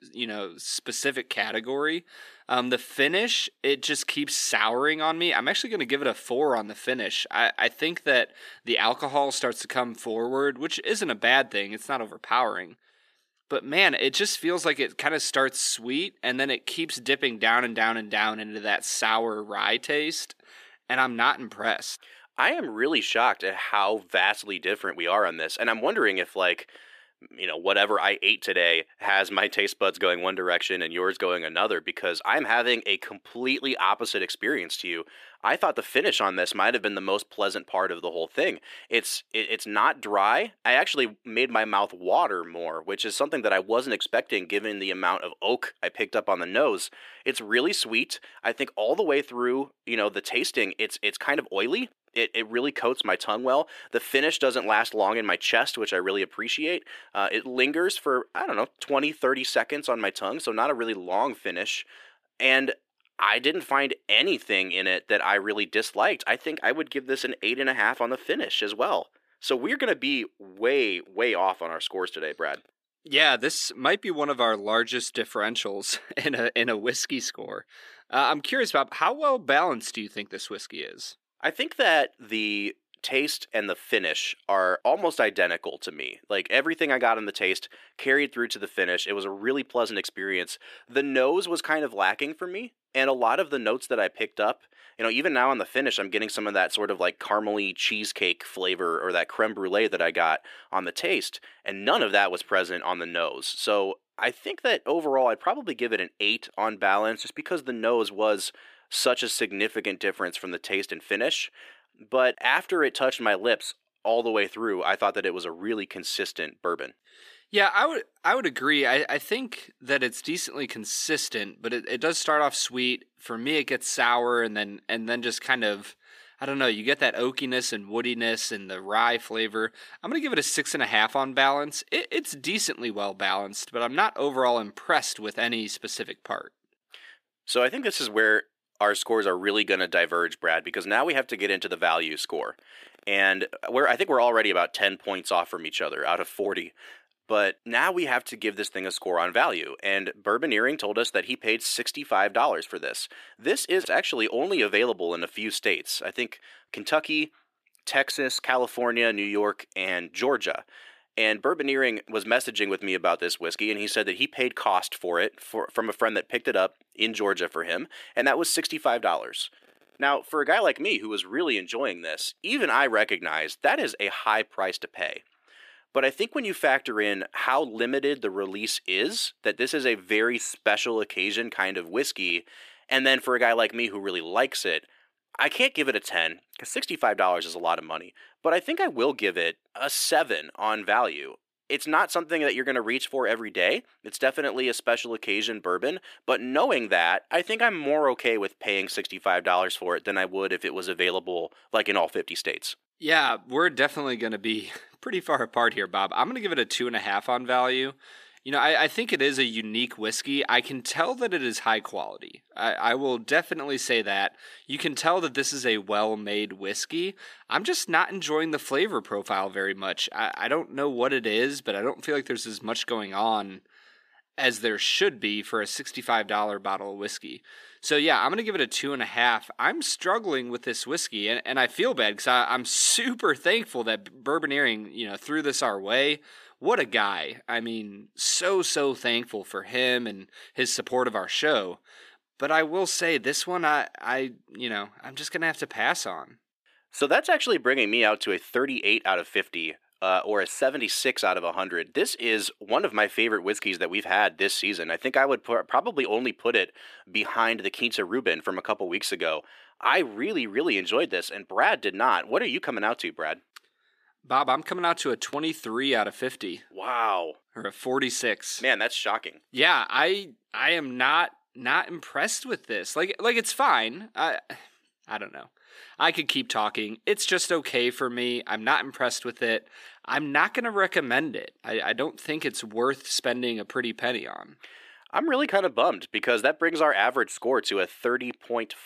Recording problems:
thin; somewhat; fading below 400 Hz

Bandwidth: 14.5 kHz